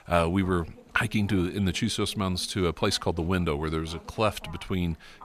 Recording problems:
voice in the background; faint; throughout; 20 dB below the speech

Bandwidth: 14.5 kHz